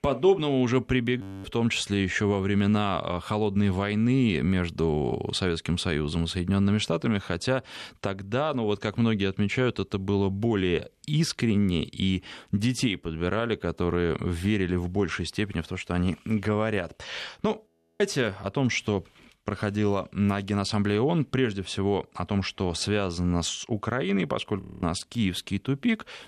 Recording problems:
audio freezing; at 1 s, at 18 s and at 25 s

